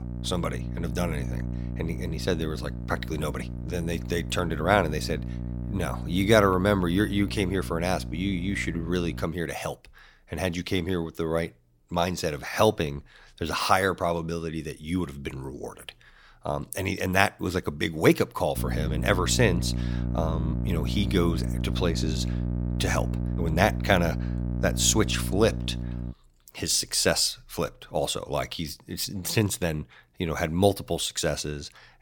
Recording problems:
electrical hum; noticeable; until 9.5 s and from 19 to 26 s; 60 Hz, 15 dB below the speech

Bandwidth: 17.5 kHz